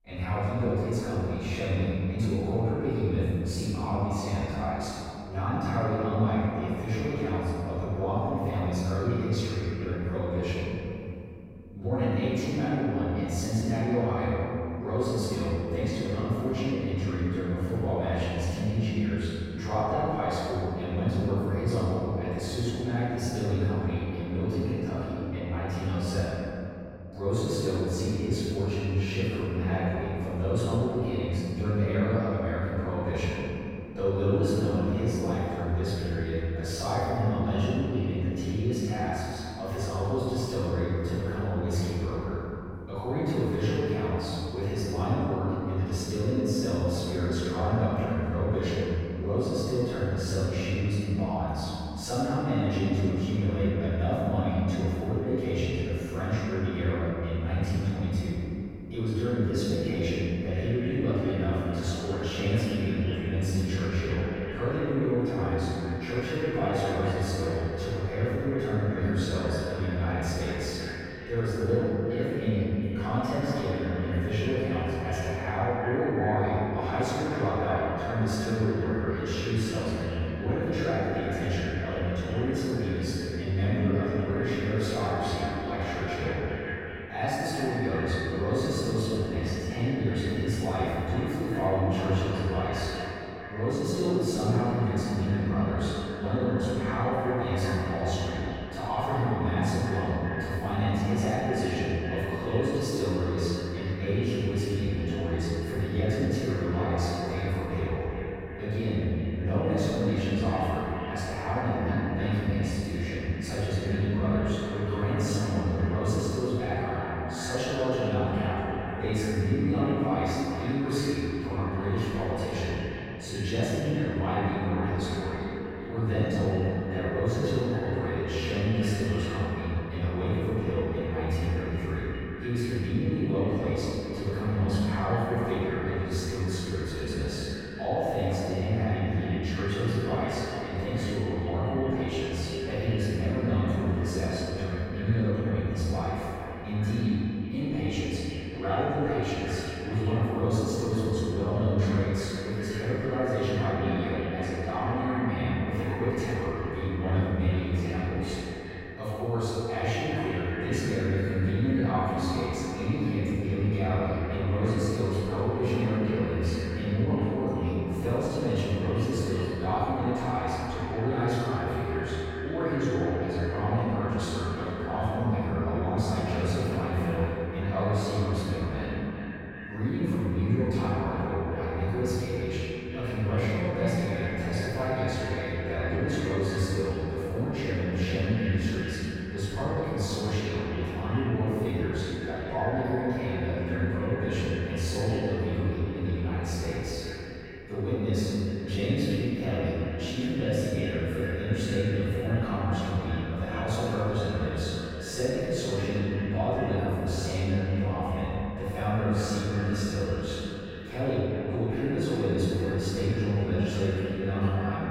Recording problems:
echo of what is said; strong; from 1:00 on; 390 ms later, 10 dB below the speech
room echo; strong; dies away in 2.8 s
off-mic speech; far

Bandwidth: 16 kHz